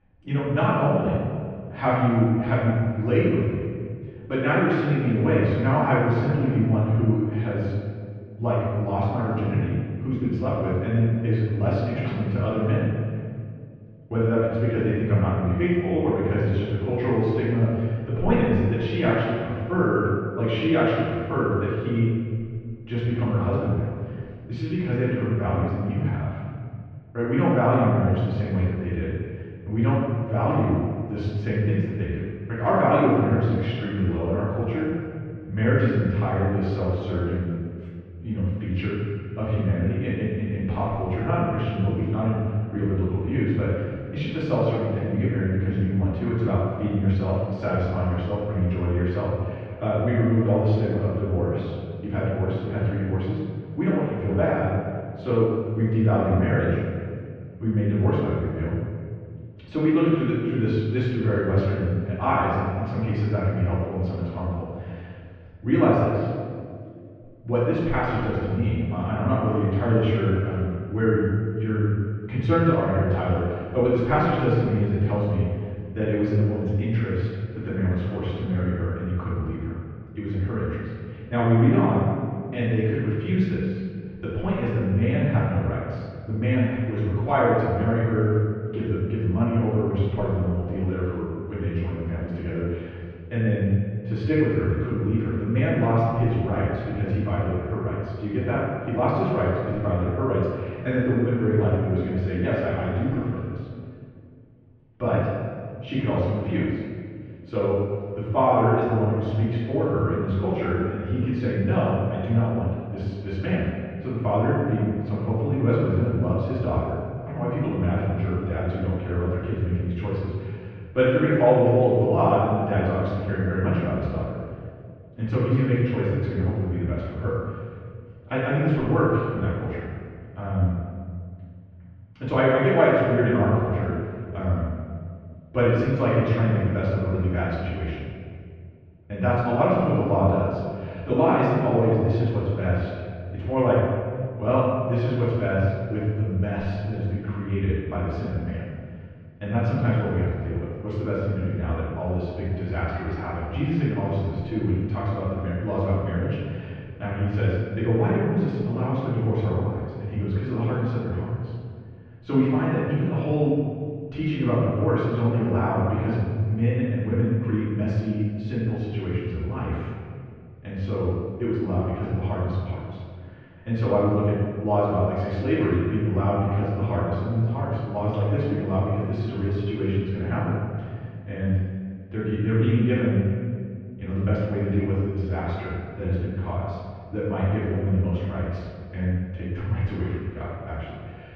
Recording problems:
room echo; strong; dies away in 1.9 s
off-mic speech; far
muffled; very; fading above 3 kHz

